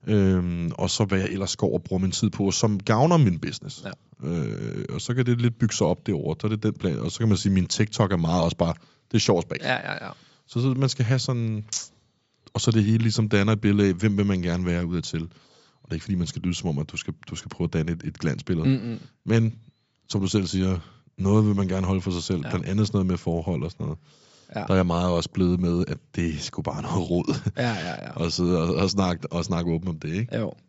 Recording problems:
high frequencies cut off; noticeable; nothing above 8 kHz

